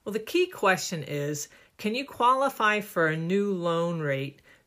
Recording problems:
none

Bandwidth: 15 kHz